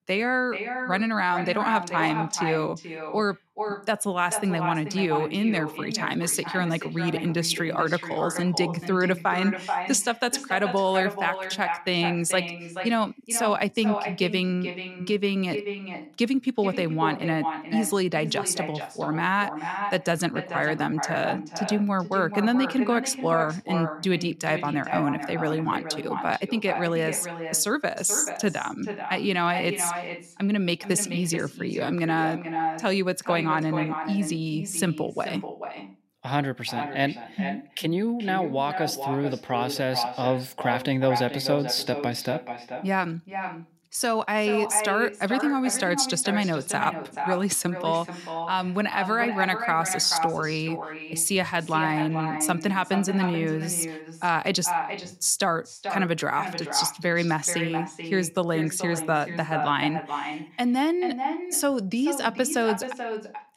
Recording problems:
echo of what is said; strong; throughout; 430 ms later, 8 dB below the speech

